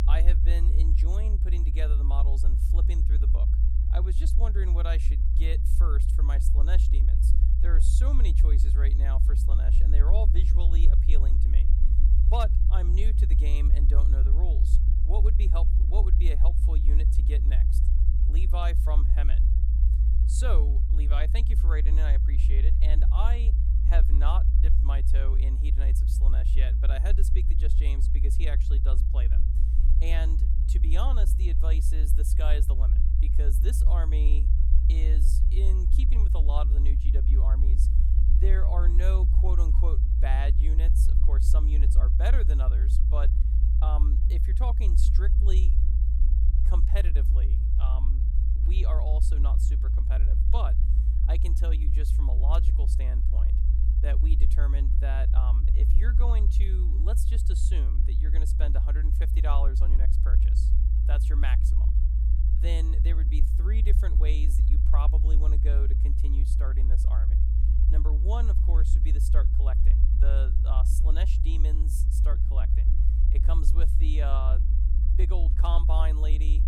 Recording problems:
low rumble; loud; throughout; 4 dB below the speech

